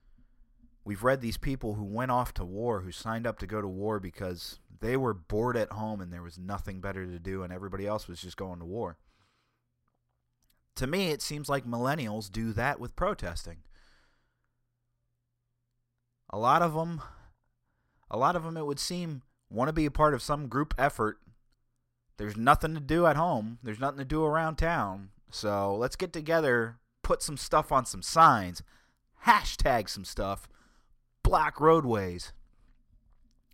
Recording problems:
none

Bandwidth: 16 kHz